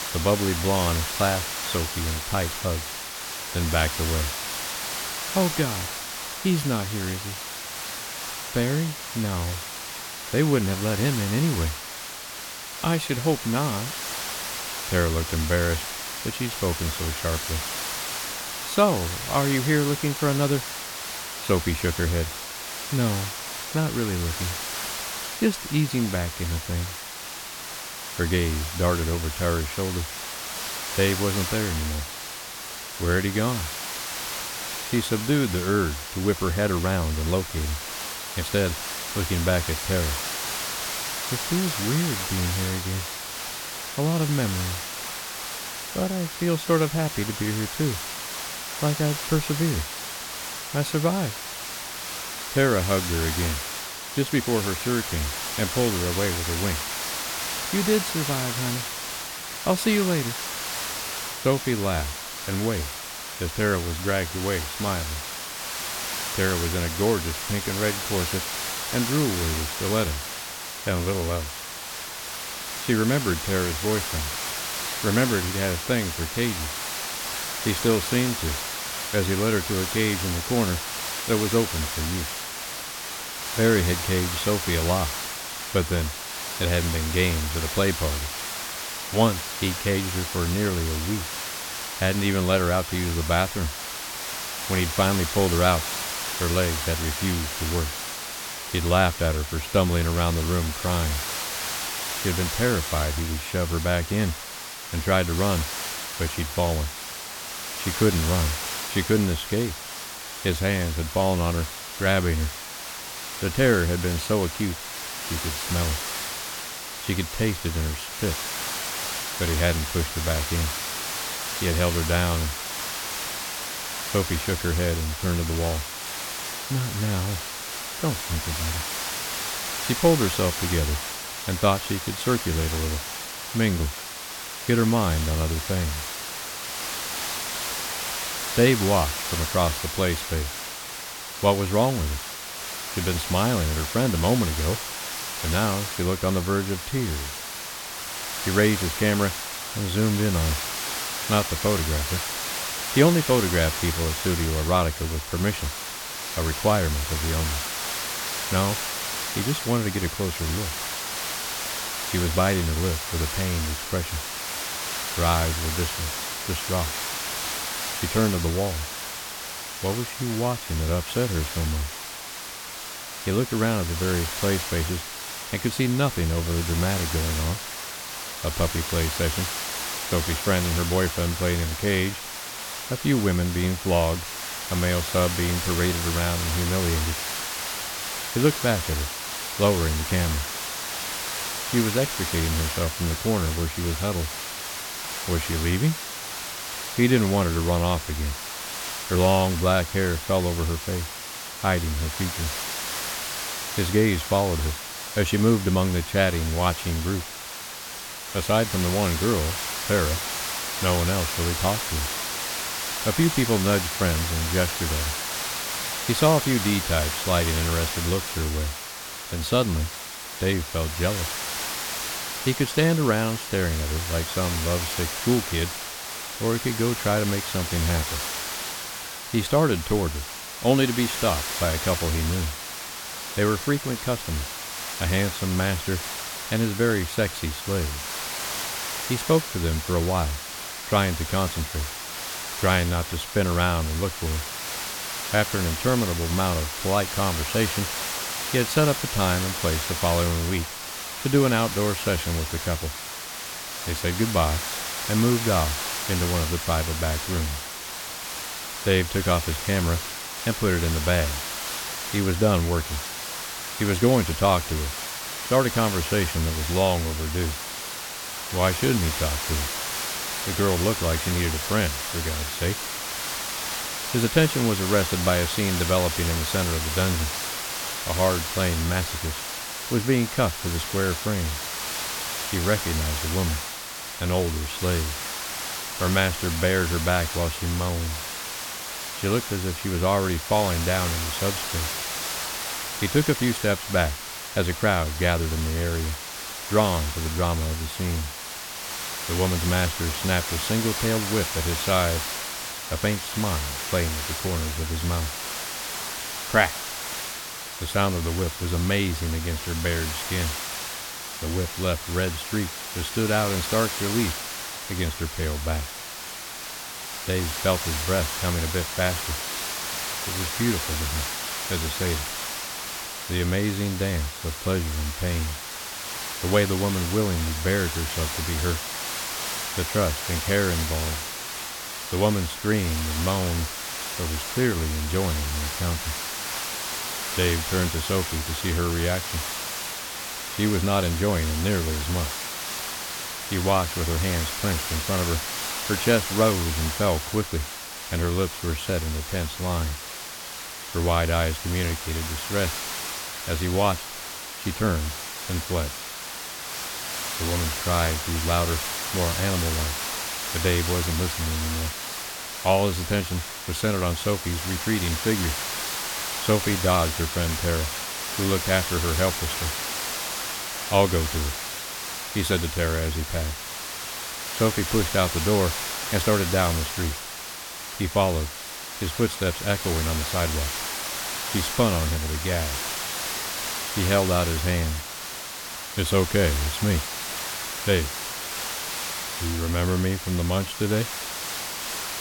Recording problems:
hiss; loud; throughout; 4 dB below the speech

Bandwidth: 17 kHz